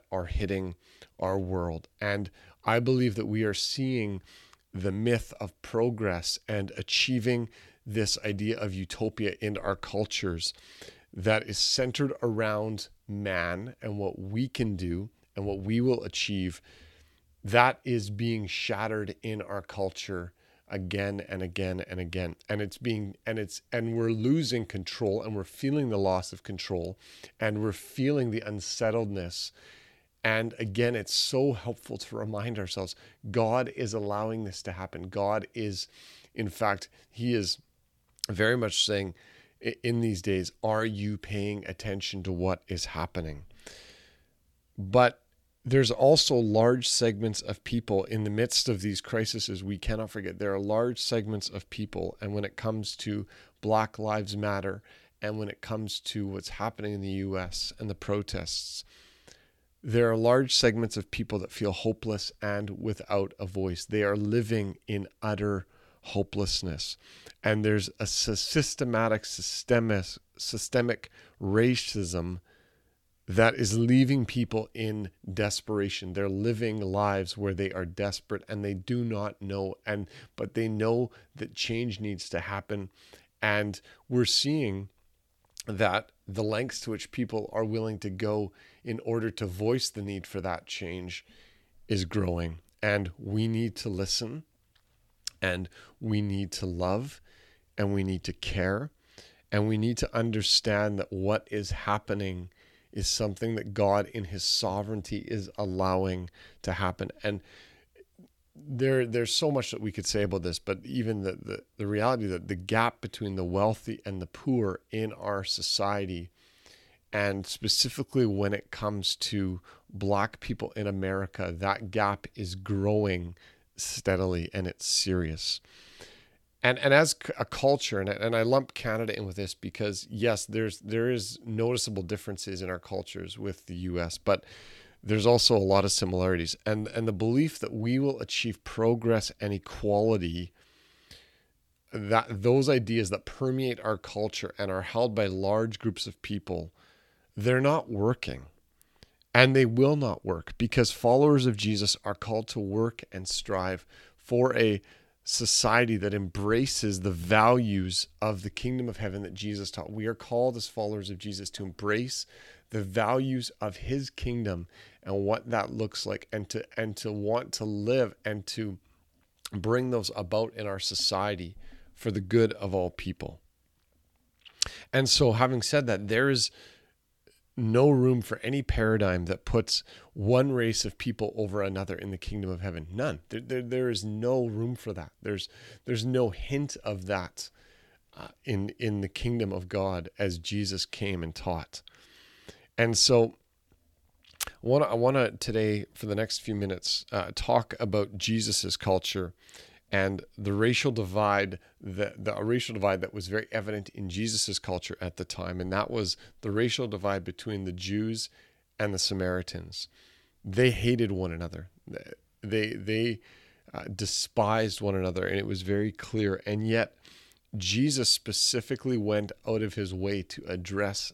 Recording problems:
none

